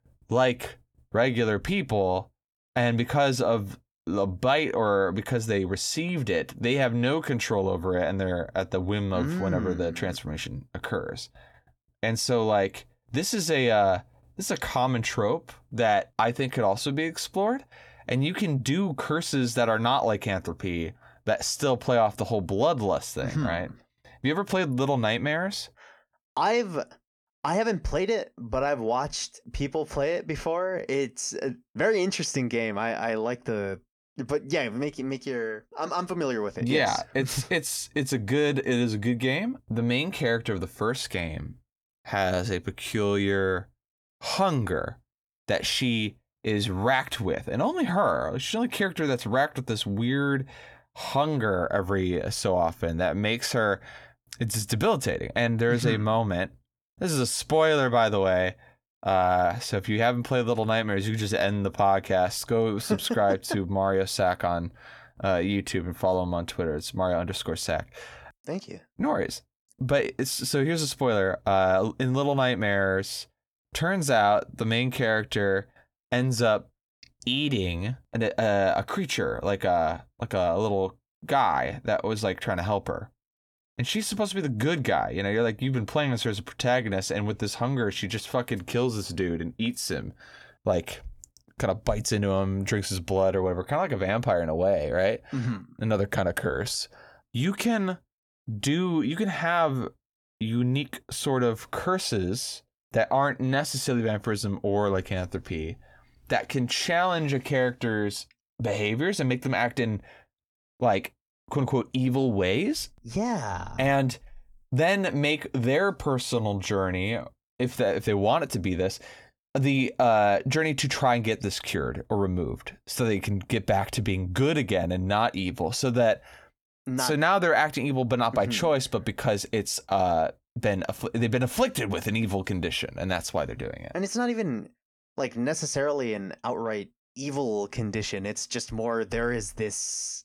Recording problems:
uneven, jittery; slightly; from 28 s to 2:17

